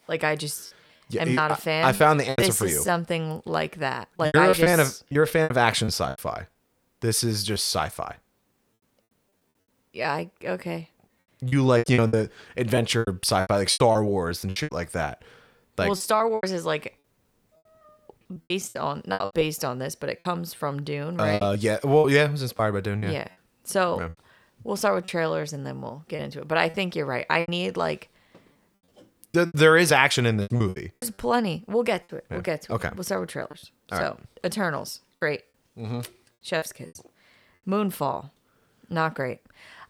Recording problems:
choppy; very; 10% of the speech affected

